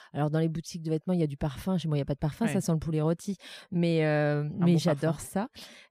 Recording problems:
none

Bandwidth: 15 kHz